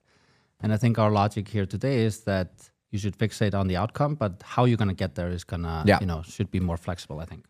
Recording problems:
none

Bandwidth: 14.5 kHz